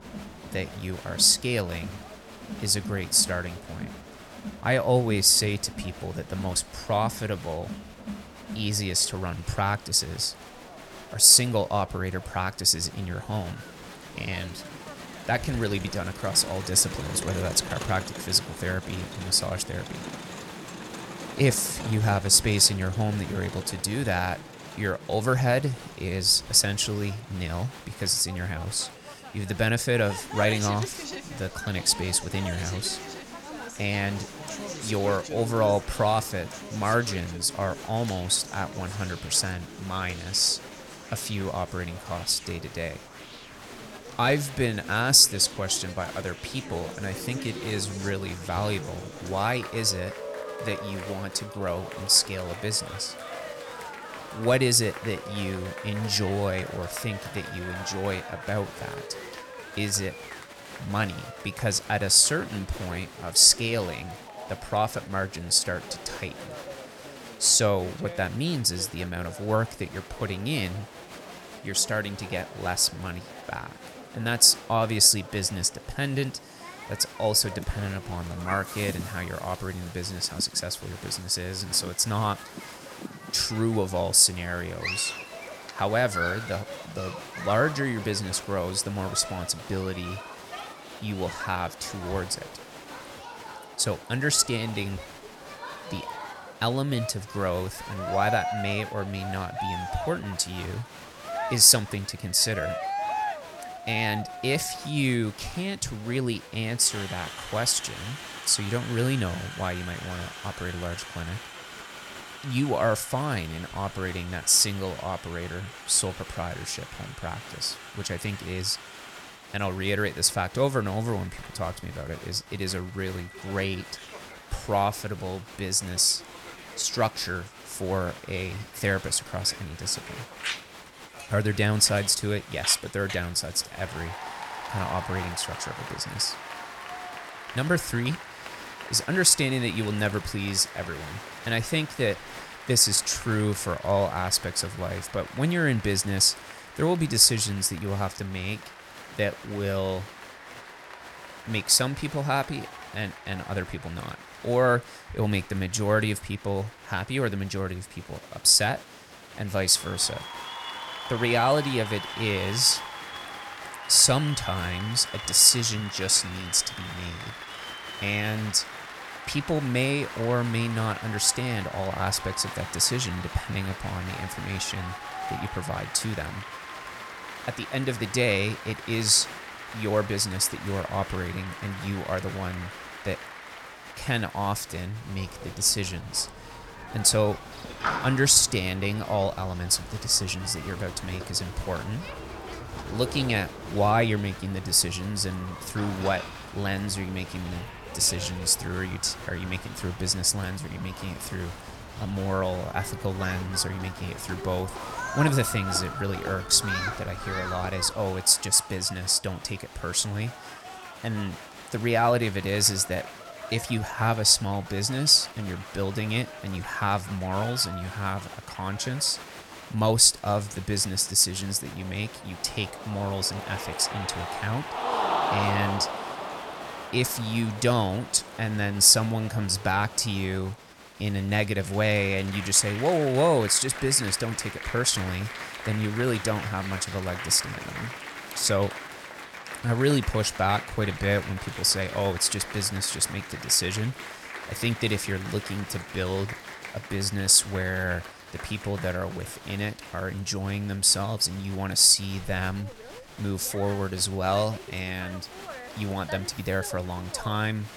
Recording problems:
crowd noise; noticeable; throughout; 15 dB below the speech

